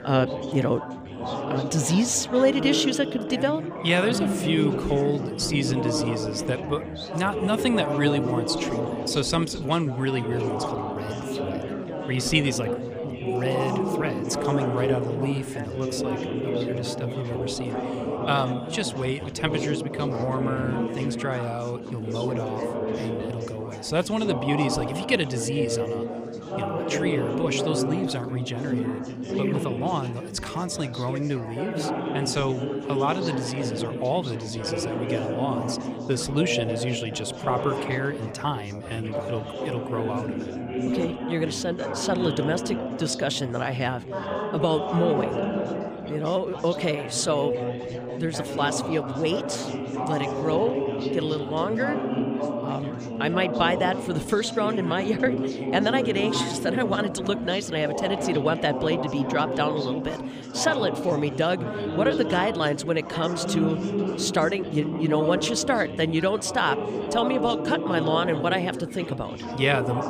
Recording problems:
chatter from many people; loud; throughout; 3 dB below the speech

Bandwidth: 15 kHz